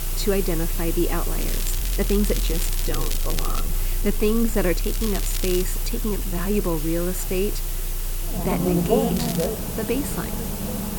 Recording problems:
traffic noise; loud; throughout; 2 dB below the speech
hiss; loud; throughout; 4 dB below the speech
crackling; loud; from 1.5 to 3.5 s, at 5 s and at 9 s; 7 dB below the speech
uneven, jittery; strongly; from 2 to 8.5 s

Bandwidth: 18 kHz